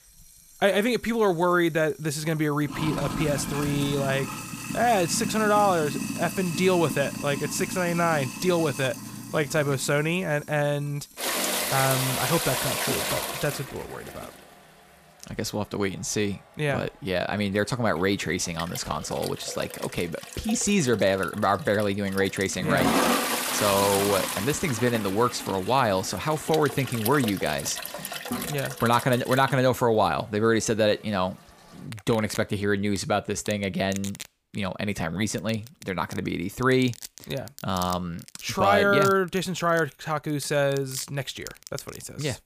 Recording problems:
household noises; loud; throughout; 6 dB below the speech

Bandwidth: 15 kHz